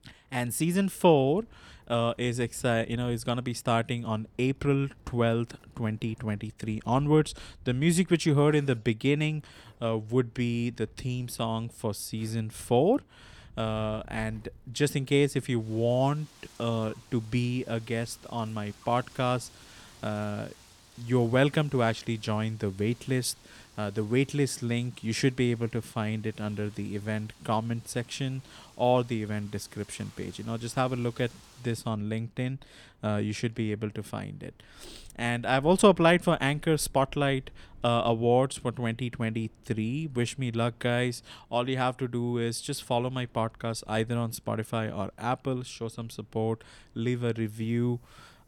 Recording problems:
wind in the background; faint; throughout; 25 dB below the speech

